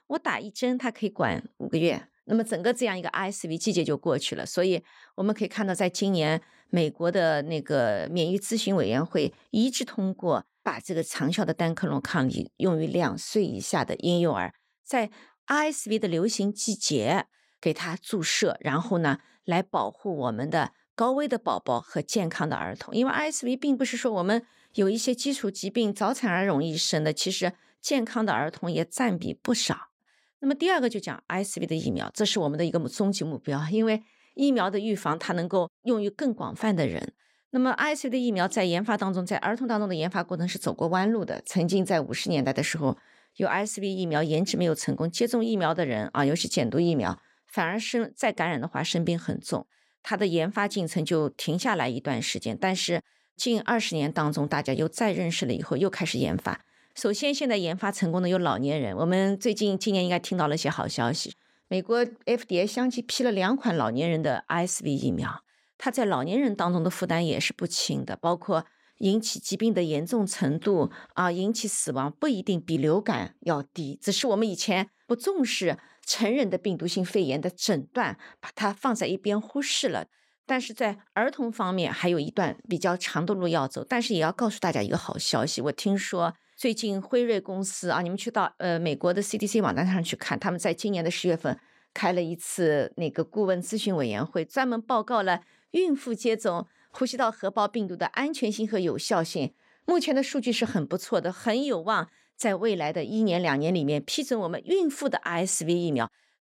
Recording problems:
none

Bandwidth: 16 kHz